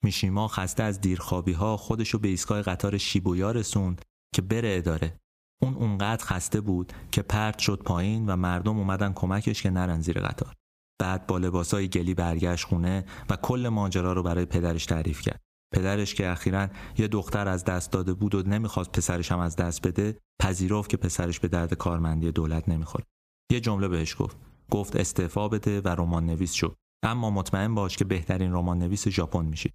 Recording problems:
squashed, flat; somewhat

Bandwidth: 15 kHz